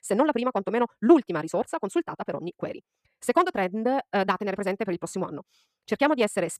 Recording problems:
wrong speed, natural pitch; too fast; 1.6 times normal speed

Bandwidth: 14.5 kHz